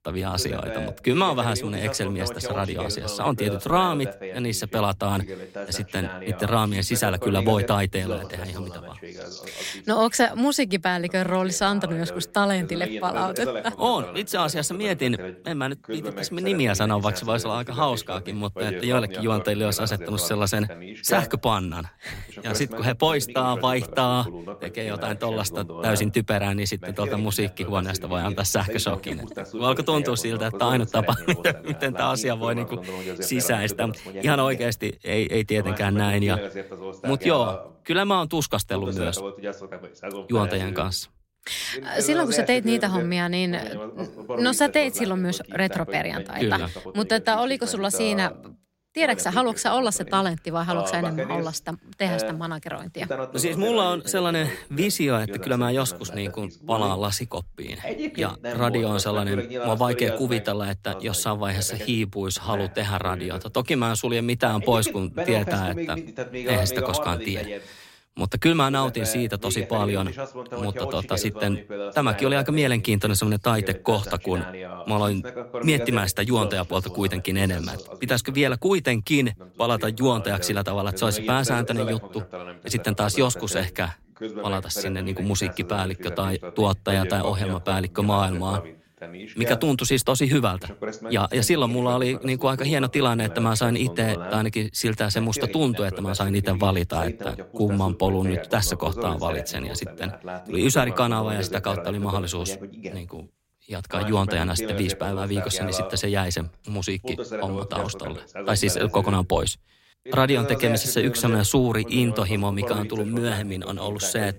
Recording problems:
voice in the background; noticeable; throughout; 10 dB below the speech

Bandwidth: 16 kHz